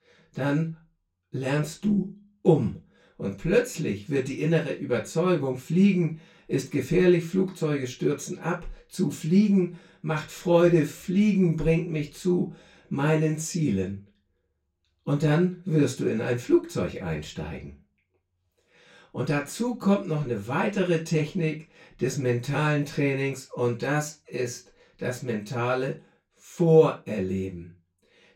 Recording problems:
off-mic speech; far
room echo; slight; dies away in 0.2 s

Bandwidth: 16 kHz